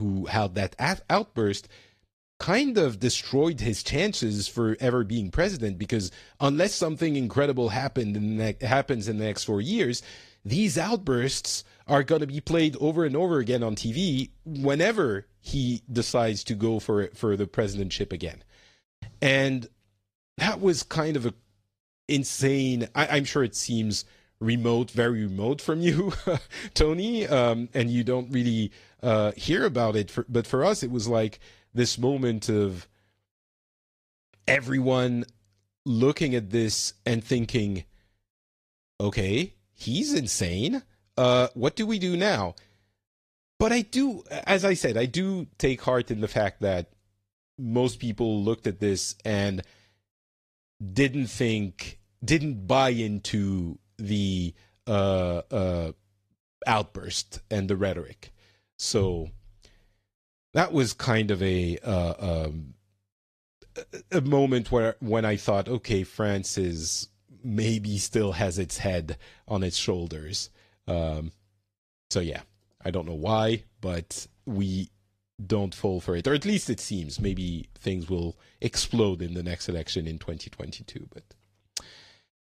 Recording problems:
garbled, watery; slightly; nothing above 14 kHz
abrupt cut into speech; at the start

